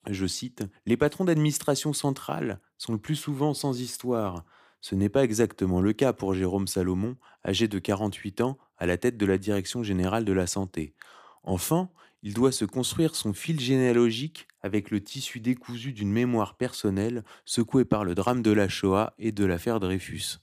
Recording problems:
none

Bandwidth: 15 kHz